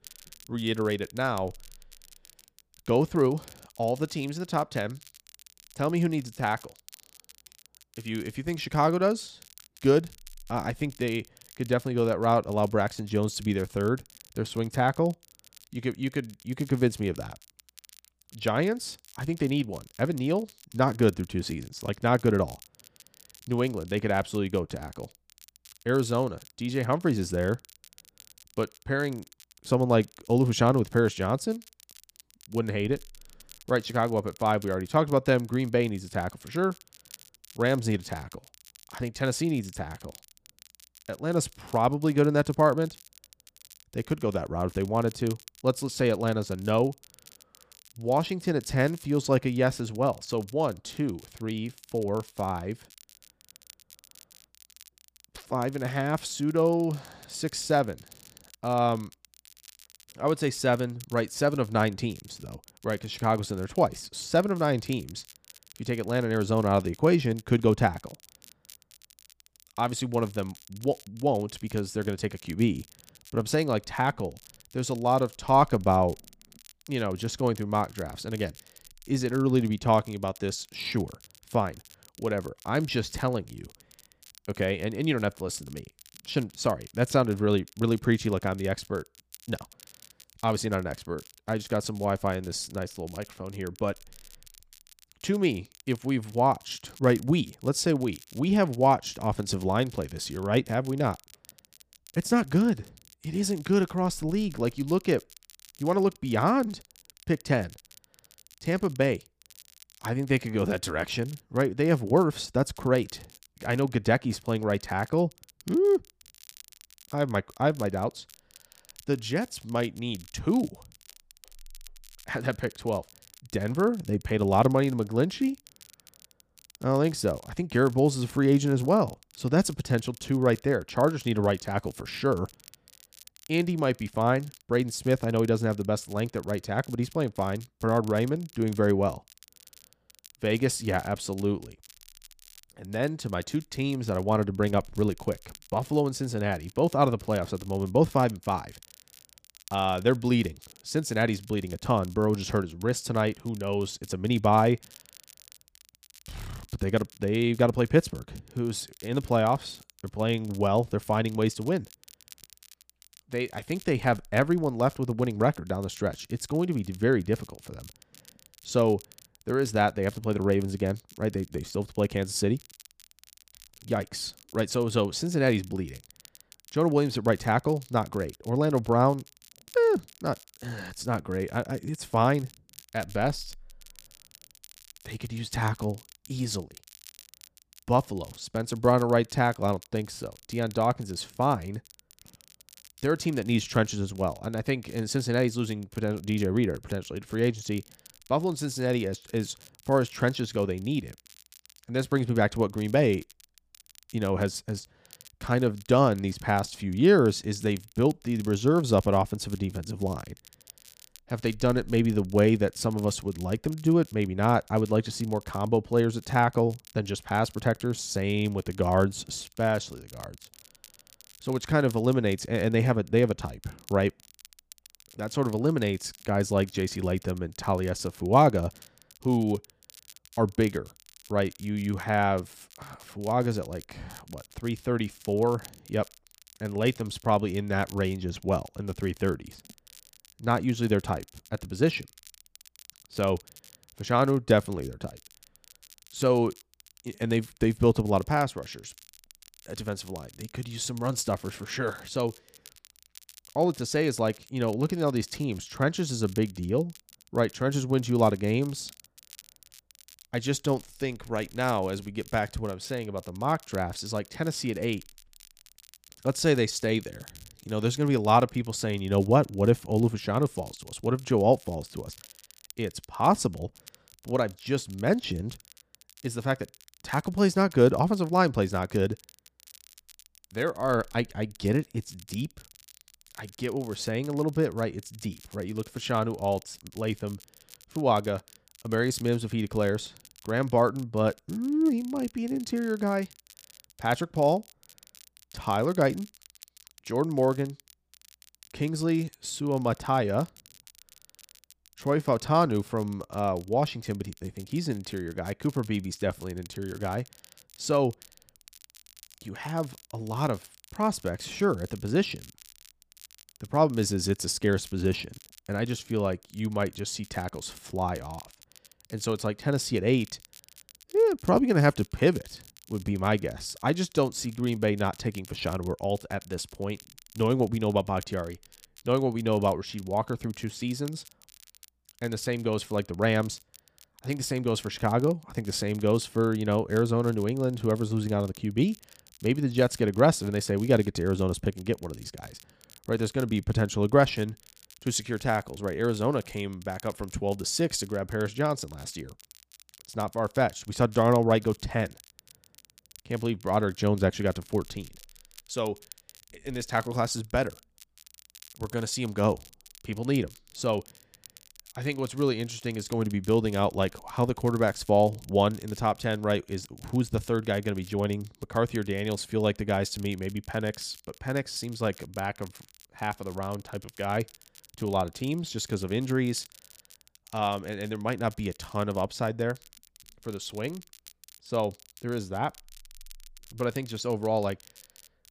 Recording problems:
crackle, like an old record; faint; 25 dB below the speech

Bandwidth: 15 kHz